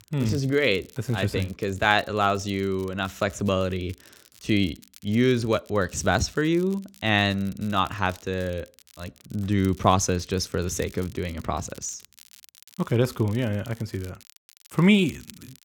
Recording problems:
crackle, like an old record; faint; 25 dB below the speech

